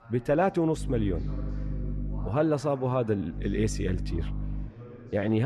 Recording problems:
muffled; slightly; fading above 3 kHz
electrical hum; noticeable; from 1 to 2.5 s and from 3.5 to 4.5 s; 50 Hz, 20 dB below the speech
chatter from many people; noticeable; throughout; 15 dB below the speech
abrupt cut into speech; at the end

